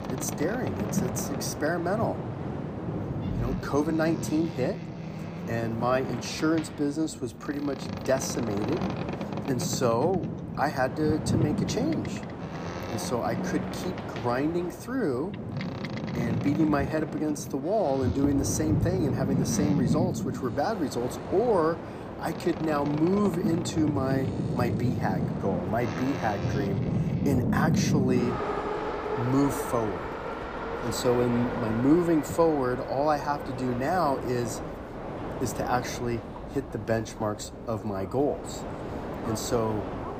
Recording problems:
train or aircraft noise; loud; throughout; 3 dB below the speech

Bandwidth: 15 kHz